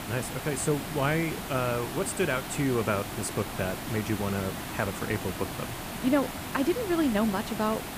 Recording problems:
hiss; loud; throughout; 6 dB below the speech

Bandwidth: 15 kHz